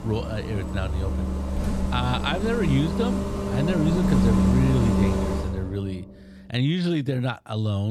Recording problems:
traffic noise; very loud; until 5.5 s; 1 dB above the speech
abrupt cut into speech; at the end

